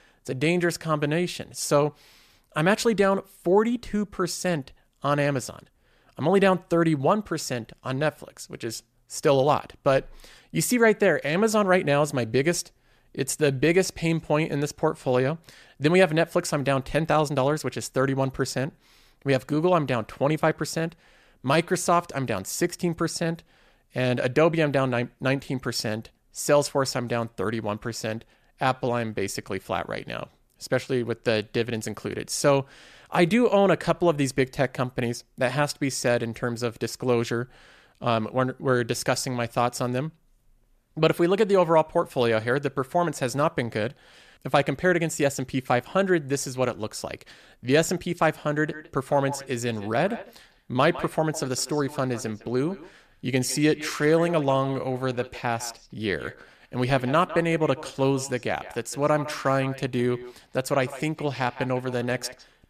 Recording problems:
echo of what is said; noticeable; from 49 s on; 160 ms later, 15 dB below the speech

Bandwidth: 14.5 kHz